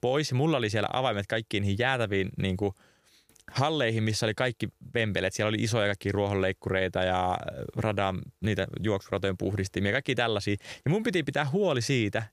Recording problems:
none

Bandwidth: 15 kHz